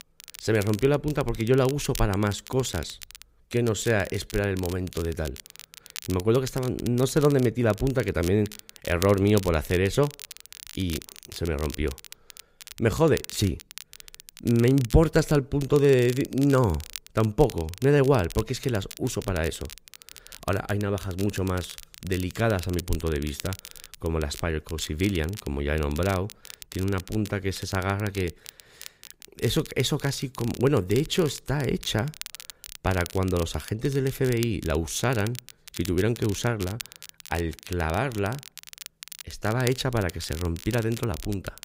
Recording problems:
crackle, like an old record; noticeable; 15 dB below the speech

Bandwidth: 15.5 kHz